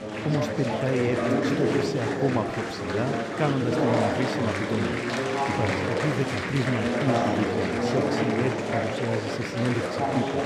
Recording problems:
murmuring crowd; very loud; throughout; 3 dB above the speech

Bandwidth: 14.5 kHz